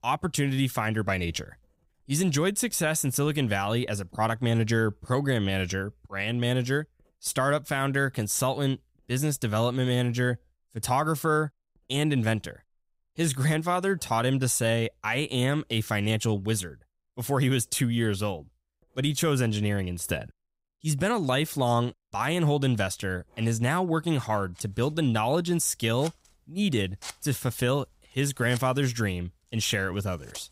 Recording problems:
household noises; faint; throughout; 20 dB below the speech

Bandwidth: 15.5 kHz